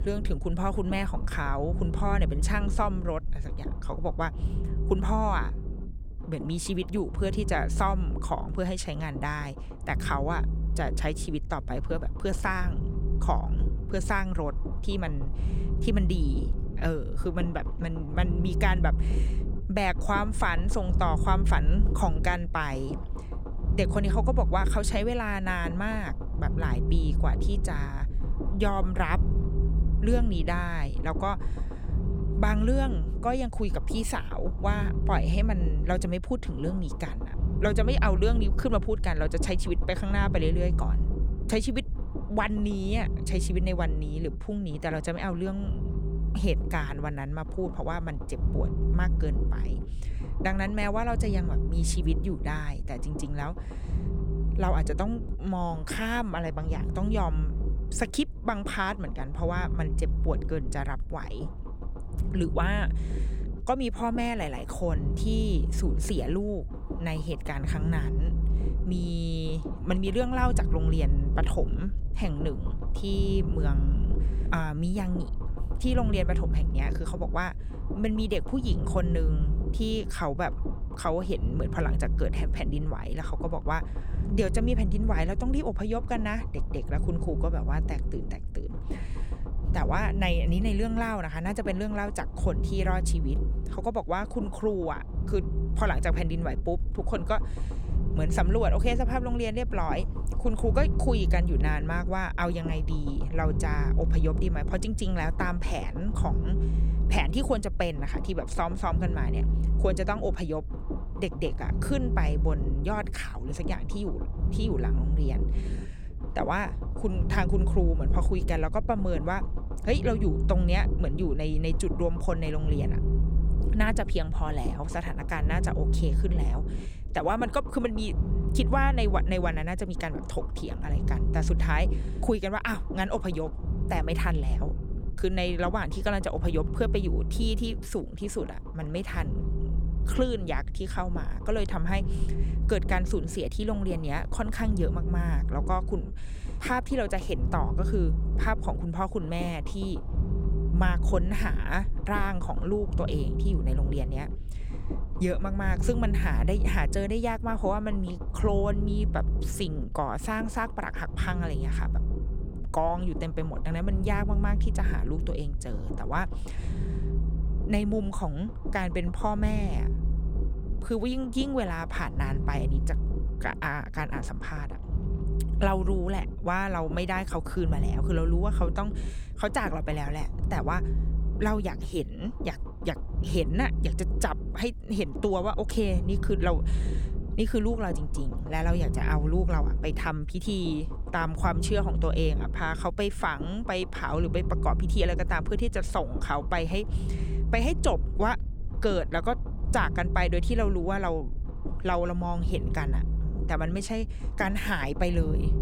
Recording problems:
low rumble; noticeable; throughout; 10 dB below the speech

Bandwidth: 18.5 kHz